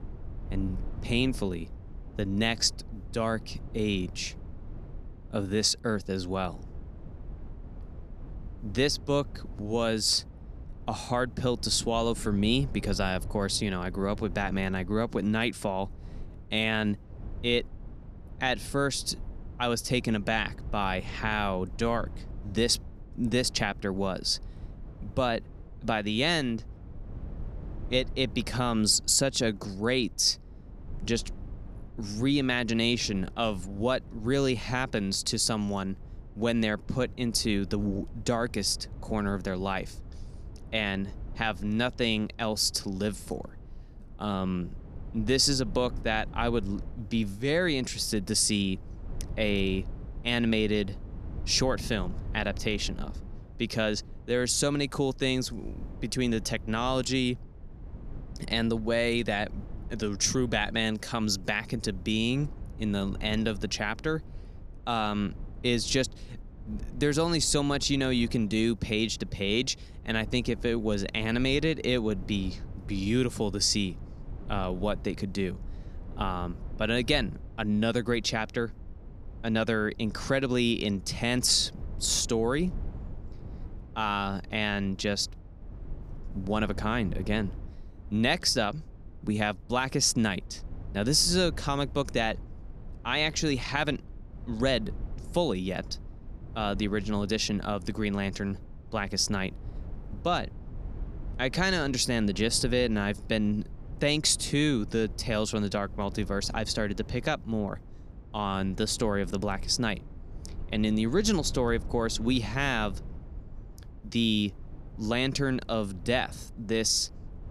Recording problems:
low rumble; faint; throughout; 25 dB below the speech

